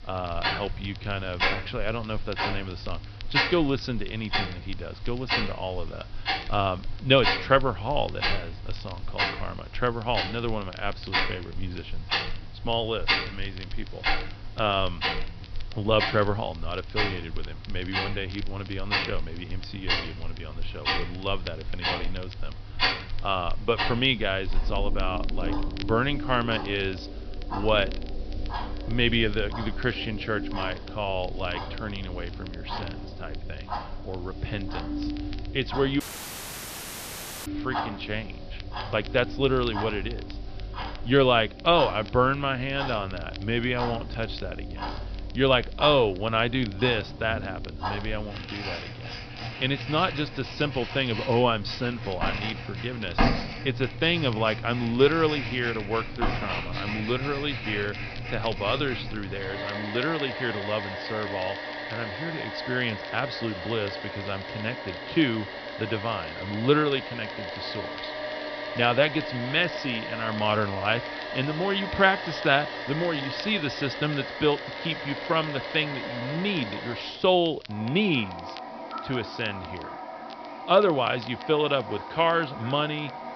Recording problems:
high frequencies cut off; noticeable; nothing above 5.5 kHz
household noises; loud; throughout; 6 dB below the speech
hiss; faint; throughout; 25 dB below the speech
crackle, like an old record; faint; 20 dB below the speech
audio cutting out; at 36 s for 1.5 s

